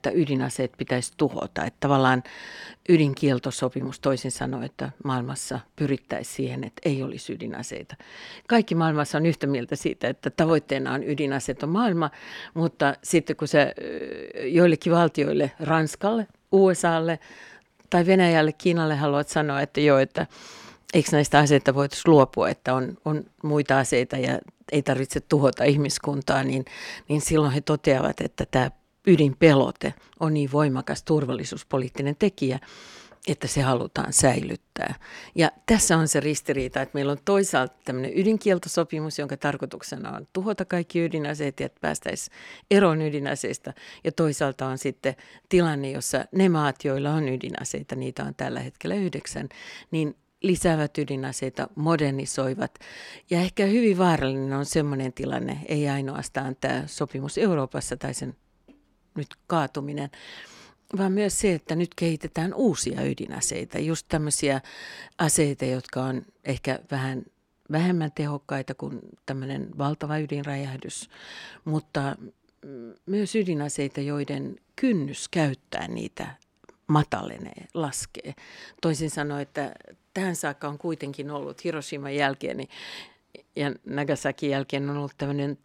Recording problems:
none

